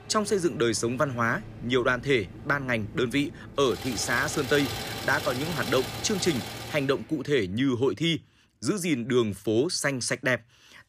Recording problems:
traffic noise; loud; until 7 s; 10 dB below the speech

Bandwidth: 15 kHz